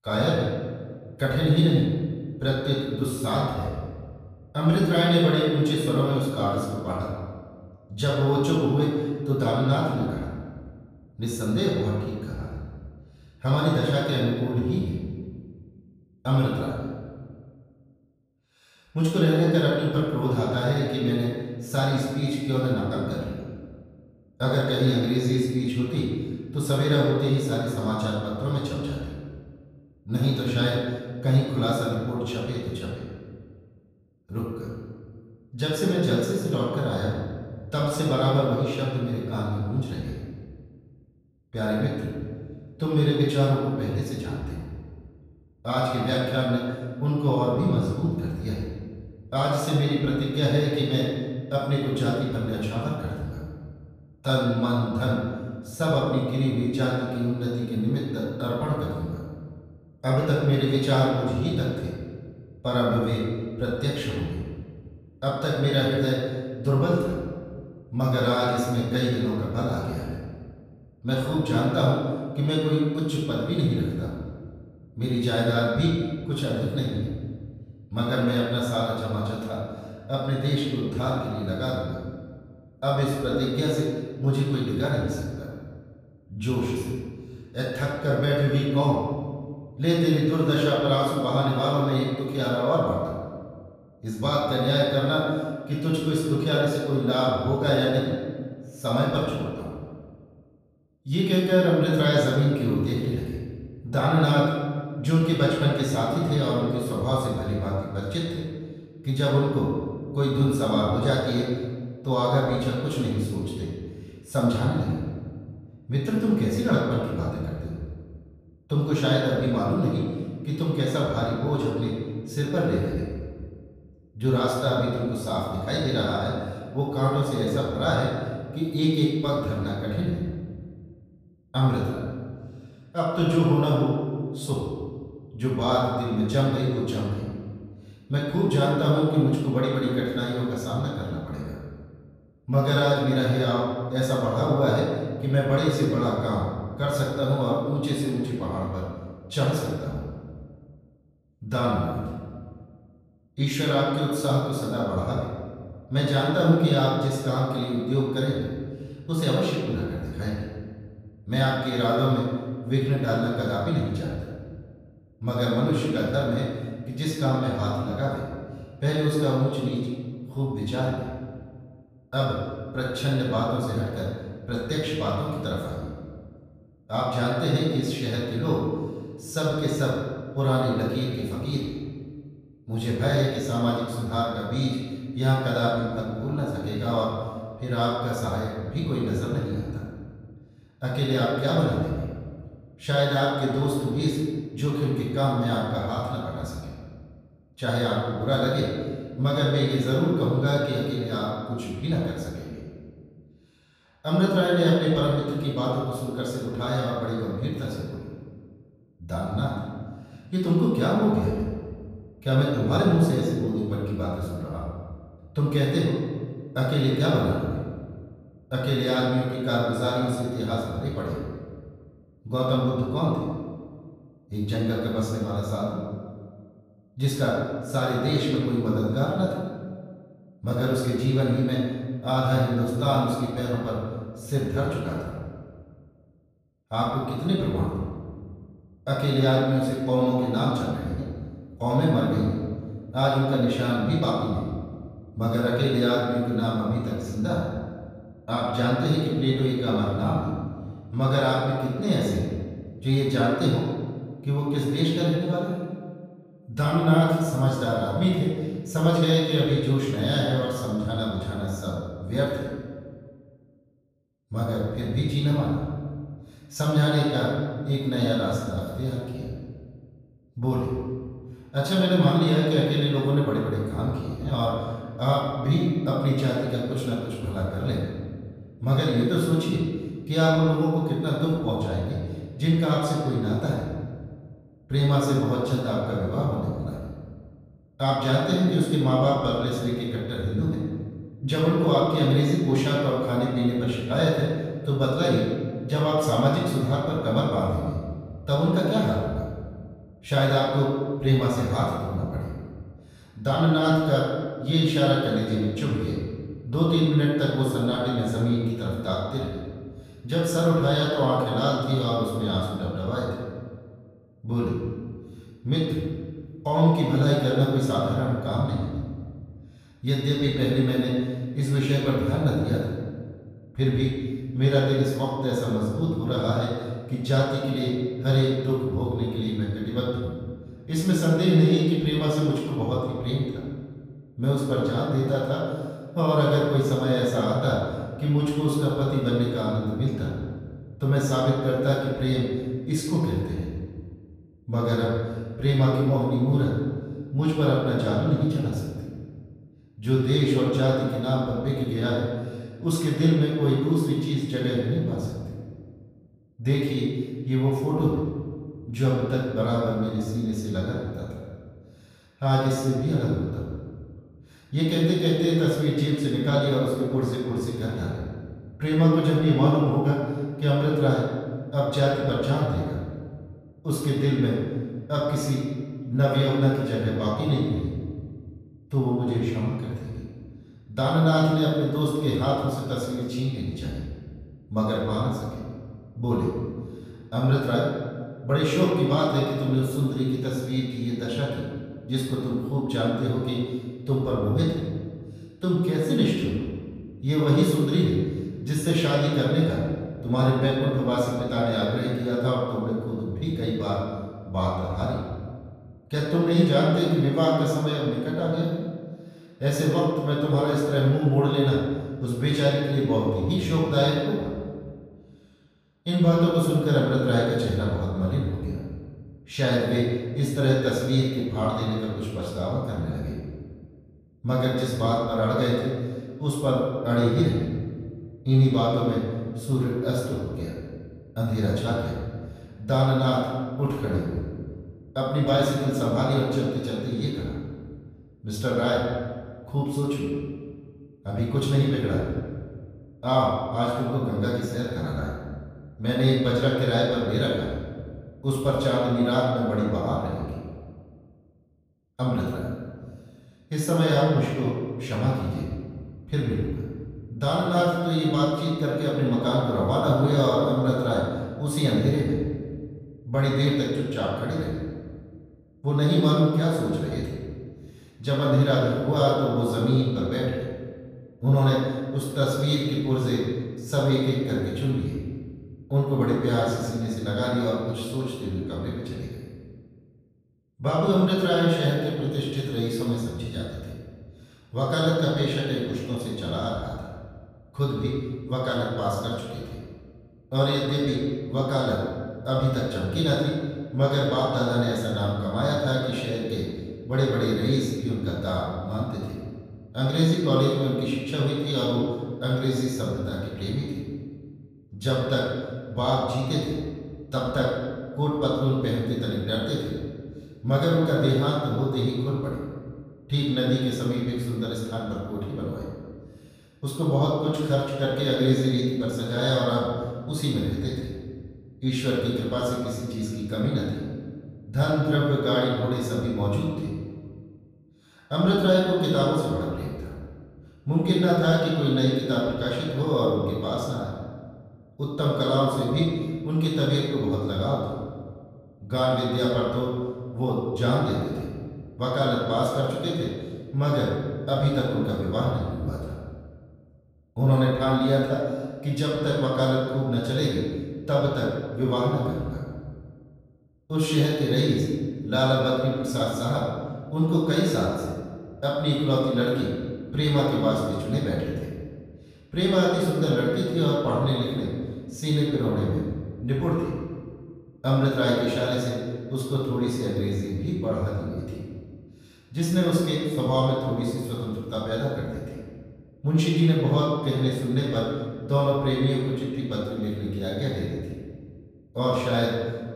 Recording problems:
room echo; strong; dies away in 1.5 s
off-mic speech; far

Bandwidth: 15 kHz